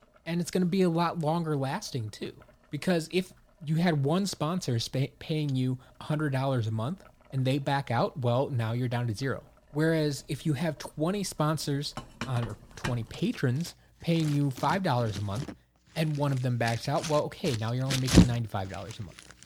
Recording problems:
household noises; loud; throughout; 2 dB below the speech

